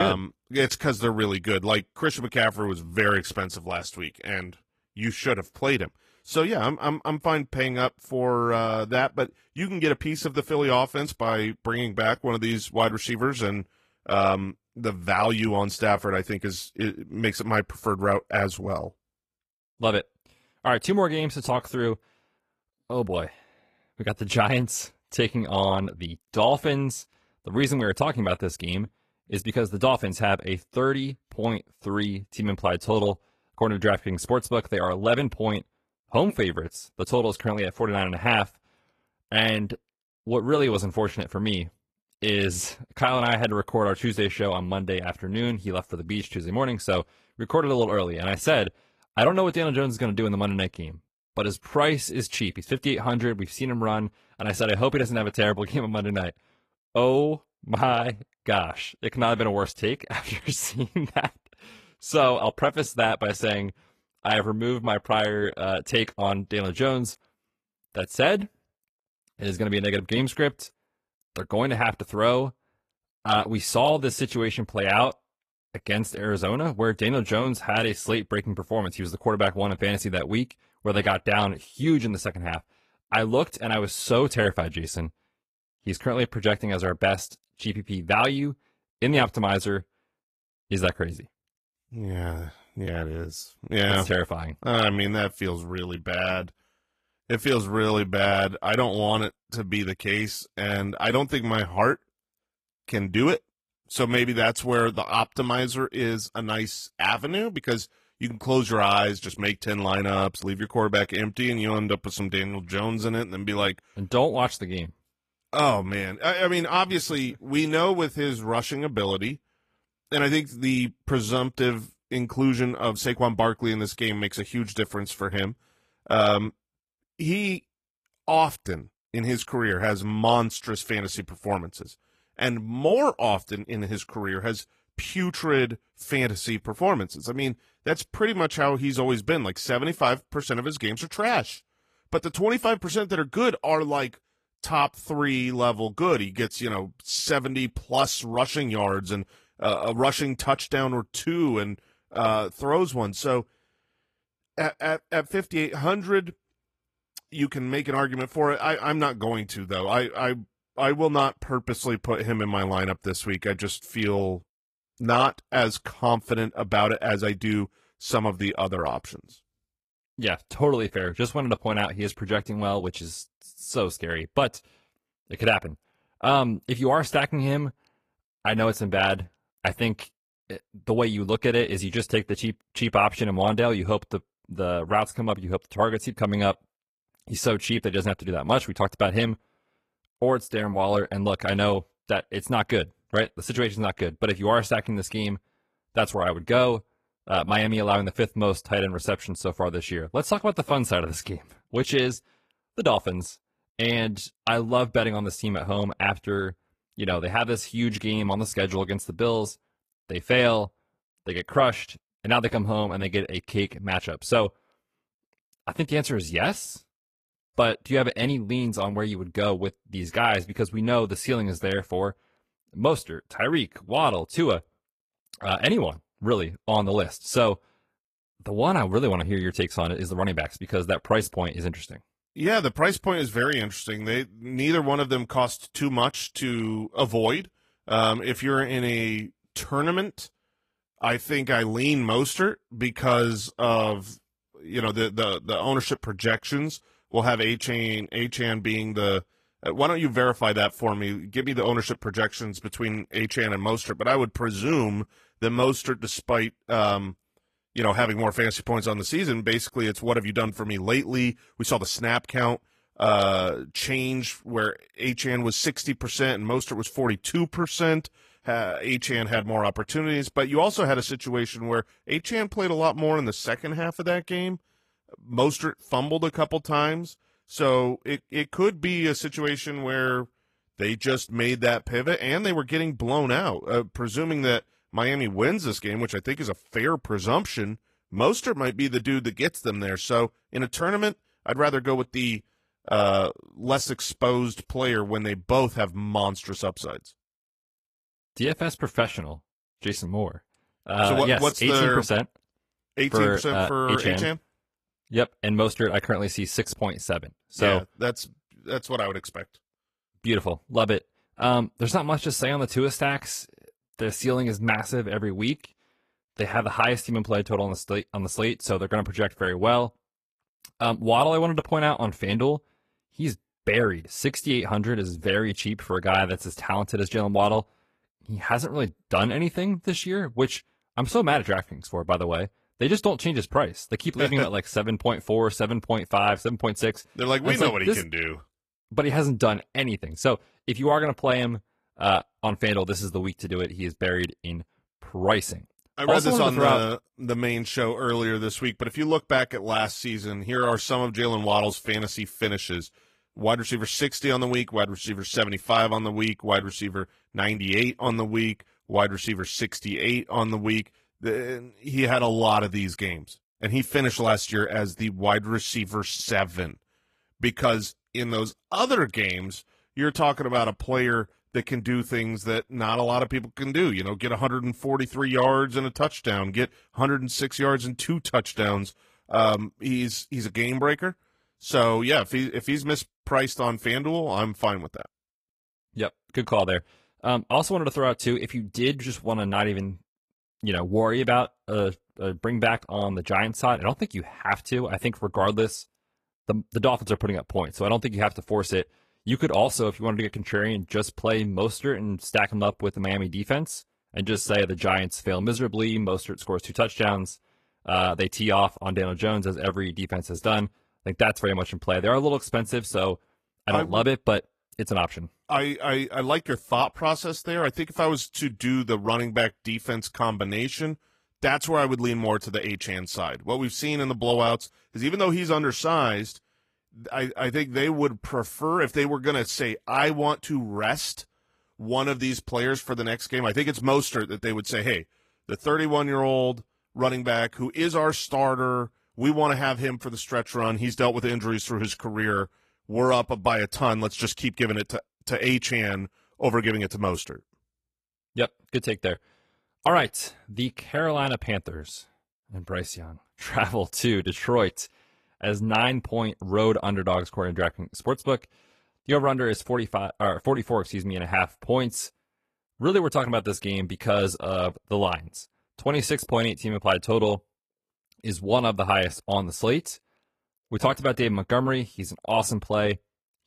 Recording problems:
garbled, watery; slightly; nothing above 14.5 kHz
abrupt cut into speech; at the start

